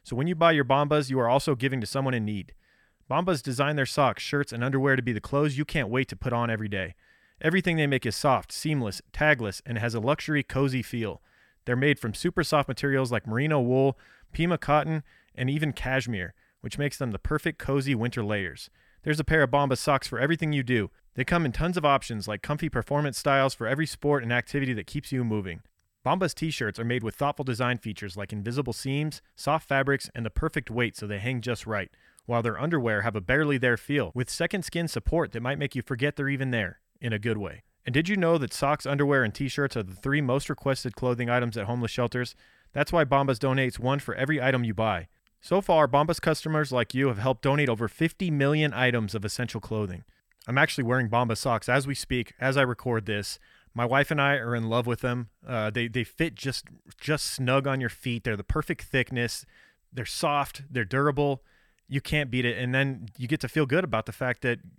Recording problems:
none

